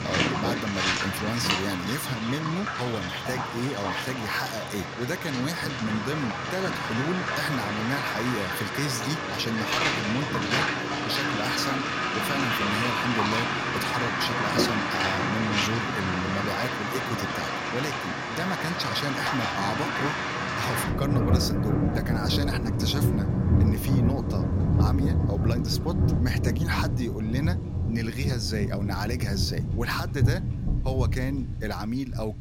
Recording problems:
rain or running water; very loud; throughout; 4 dB above the speech

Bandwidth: 16 kHz